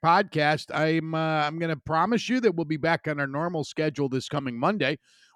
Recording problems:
none

